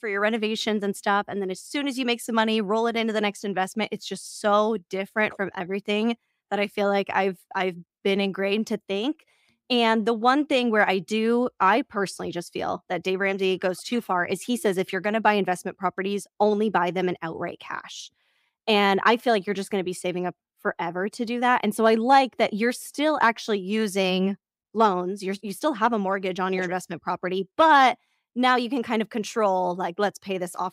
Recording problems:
none

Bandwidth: 15.5 kHz